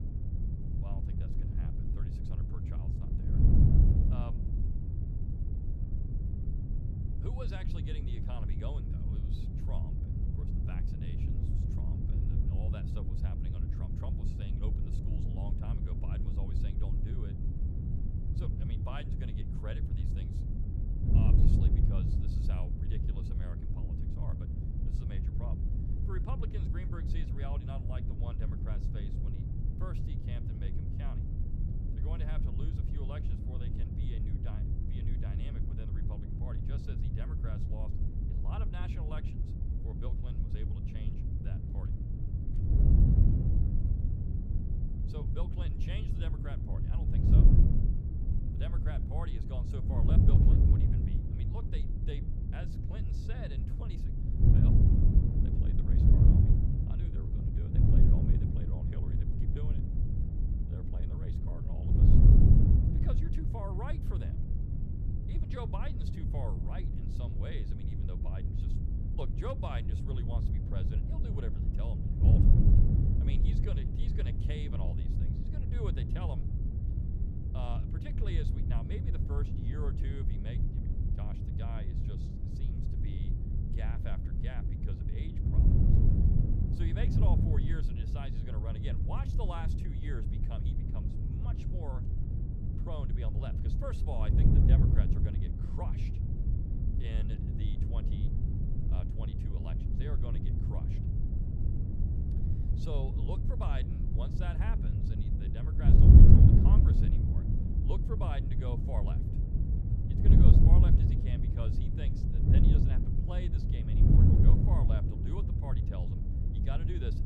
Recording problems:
wind noise on the microphone; heavy; 4 dB above the speech

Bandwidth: 14.5 kHz